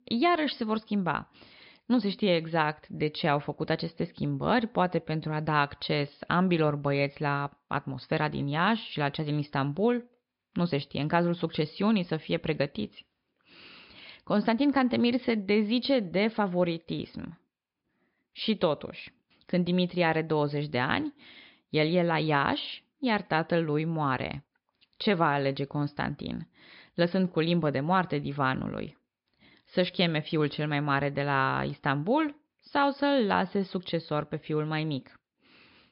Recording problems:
high frequencies cut off; noticeable; nothing above 5.5 kHz

